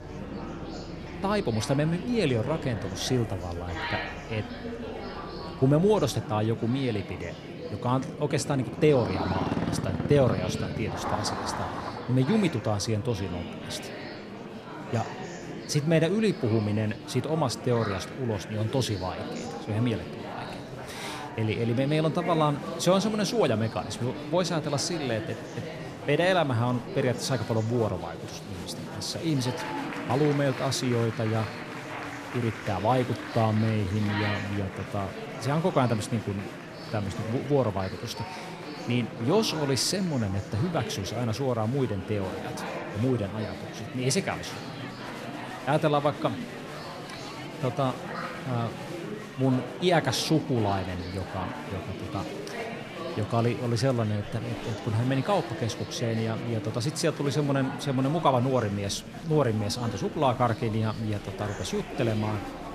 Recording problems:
murmuring crowd; loud; throughout; 9 dB below the speech
traffic noise; noticeable; until 27 s; 10 dB below the speech

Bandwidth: 14 kHz